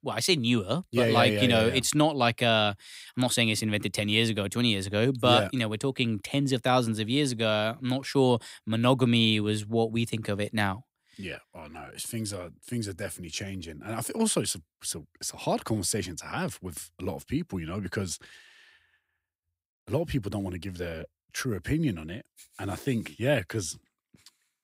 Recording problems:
none

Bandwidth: 15.5 kHz